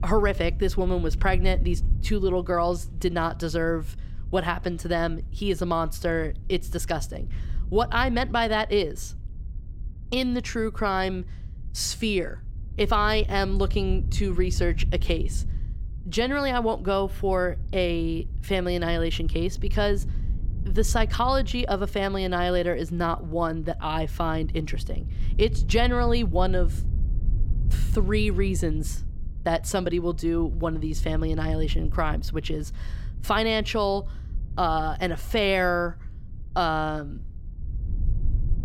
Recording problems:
low rumble; faint; throughout; 25 dB below the speech

